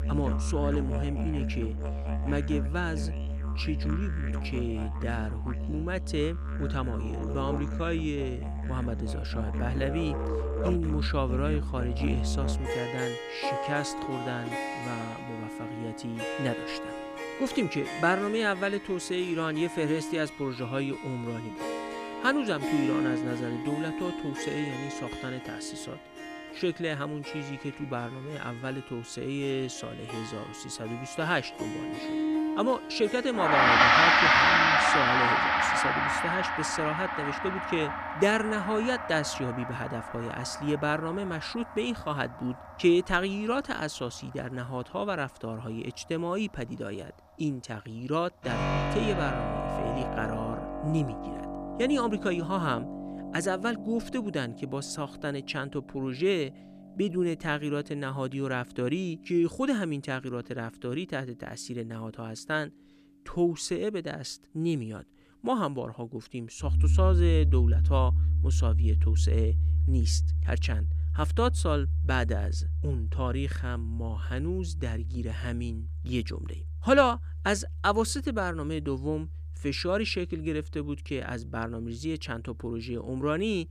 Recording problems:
background music; very loud; throughout; 2 dB above the speech

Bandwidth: 14.5 kHz